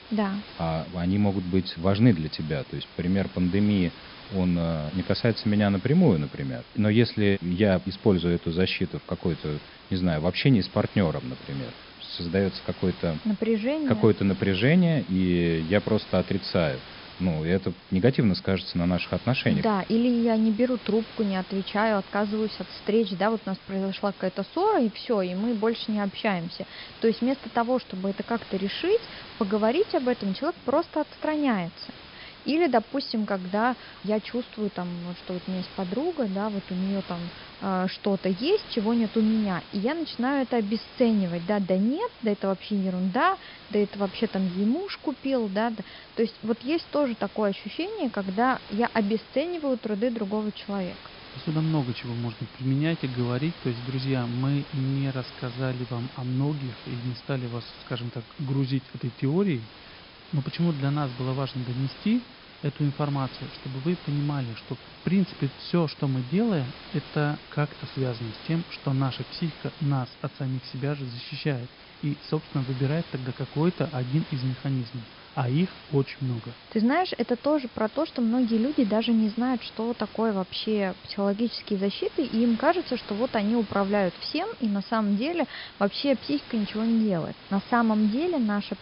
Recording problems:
high frequencies cut off; noticeable; nothing above 5.5 kHz
hiss; noticeable; throughout; 15 dB below the speech

